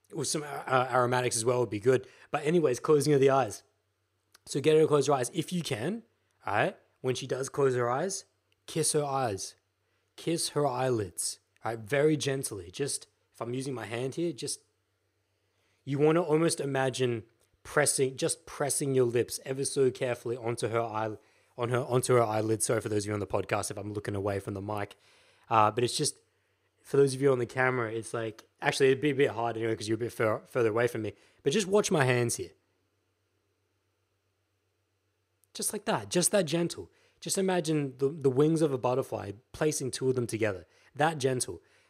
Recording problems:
none

